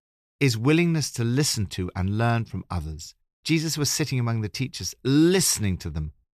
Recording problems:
none

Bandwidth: 14 kHz